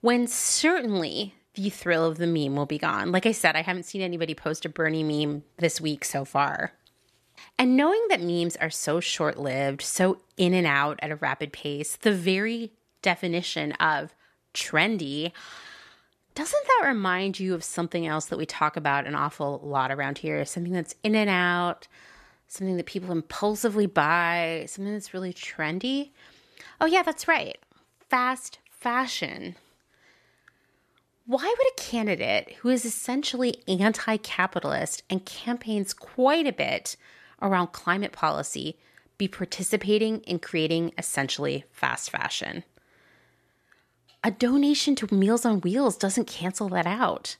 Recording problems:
none

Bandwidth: 13.5 kHz